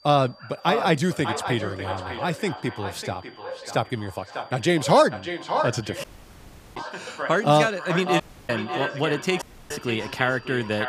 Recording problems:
echo of what is said; strong; throughout; 600 ms later, 8 dB below the speech
animal sounds; noticeable; throughout; 15 dB below the speech
high-pitched whine; faint; throughout; 4.5 kHz, 30 dB below the speech
audio cutting out; at 6 s for 0.5 s, at 8 s and at 9.5 s

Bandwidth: 15 kHz